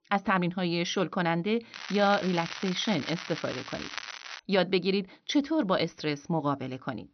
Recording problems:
high frequencies cut off; noticeable; nothing above 6 kHz
crackling; loud; from 1.5 to 4.5 s; 10 dB below the speech

